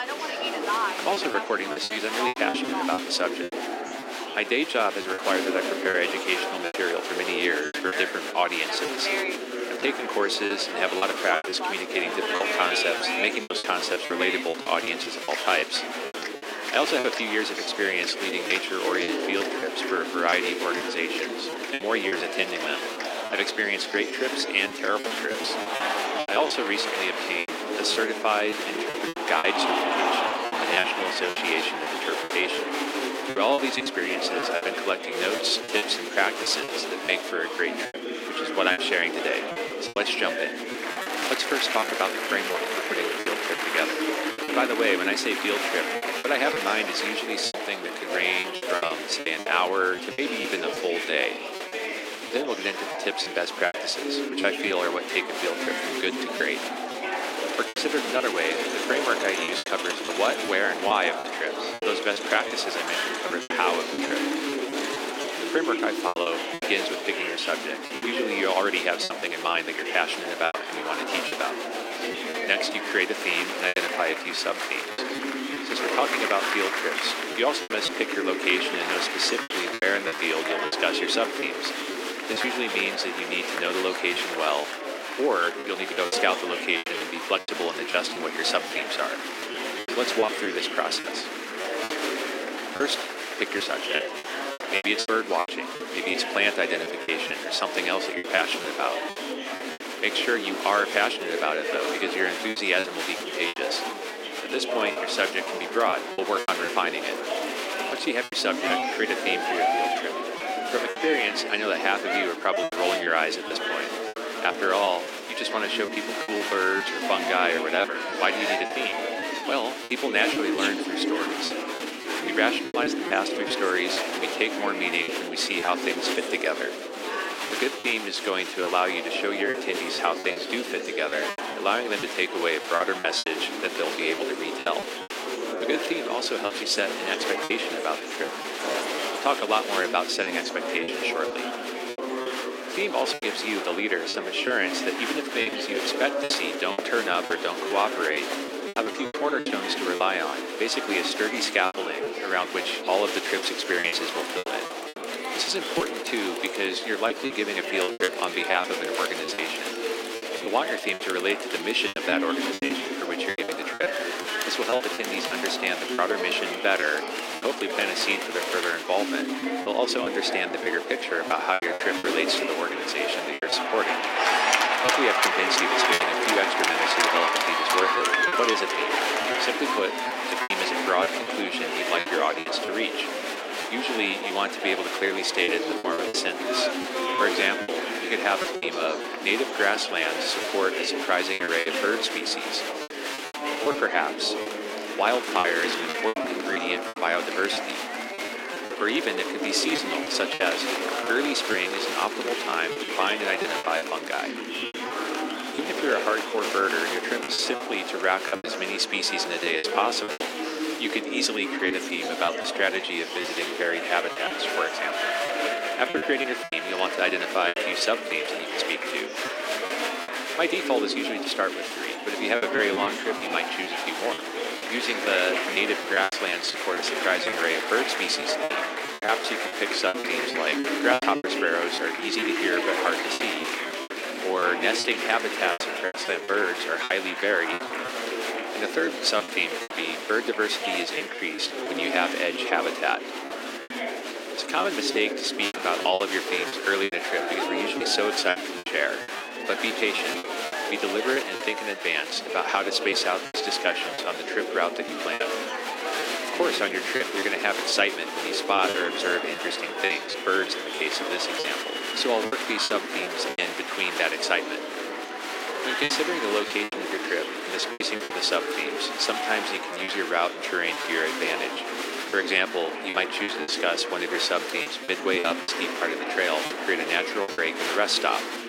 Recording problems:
thin; very; fading below 300 Hz
murmuring crowd; loud; throughout; 2 dB below the speech
choppy; very; 8% of the speech affected

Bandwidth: 16 kHz